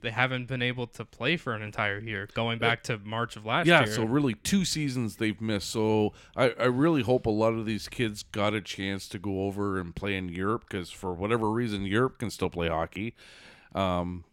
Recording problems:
none

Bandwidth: 16.5 kHz